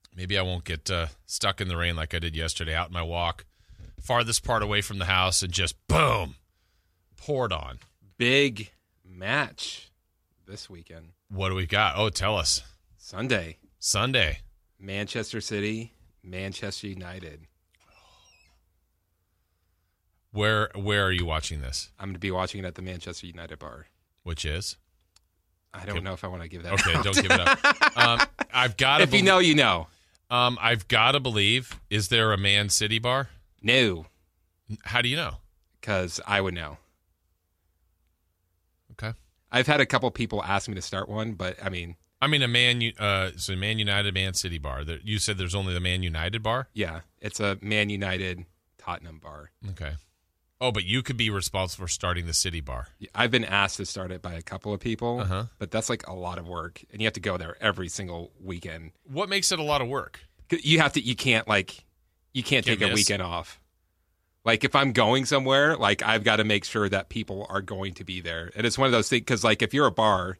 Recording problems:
none

